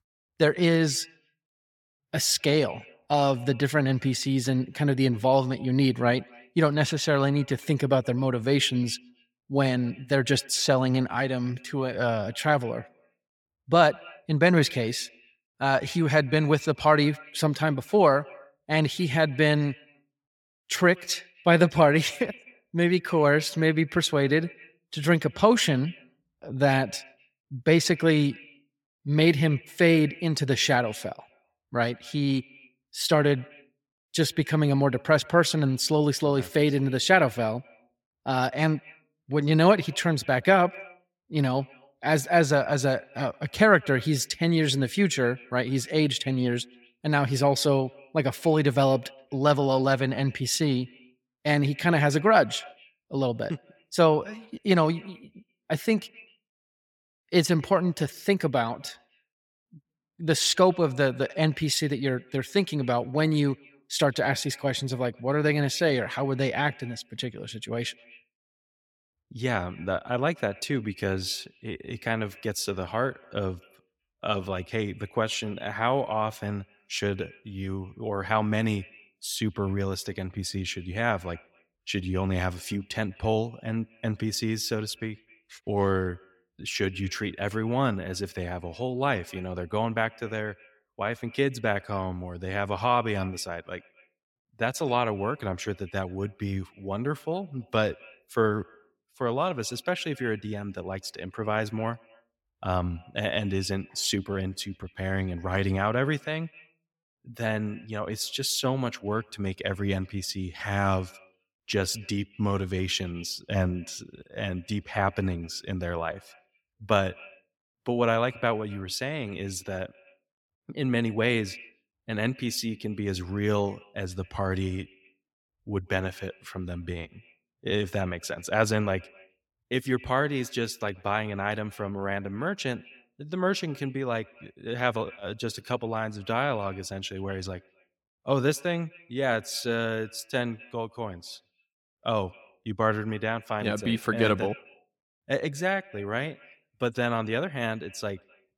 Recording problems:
echo of what is said; faint; throughout; 130 ms later, 25 dB below the speech

